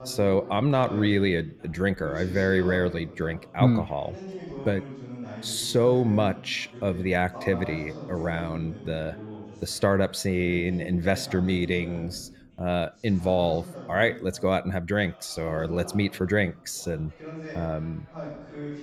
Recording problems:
background chatter; noticeable; throughout; 2 voices, 15 dB below the speech

